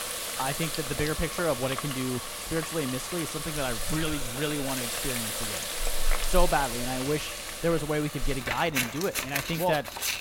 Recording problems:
household noises; loud; throughout; 1 dB below the speech

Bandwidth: 16.5 kHz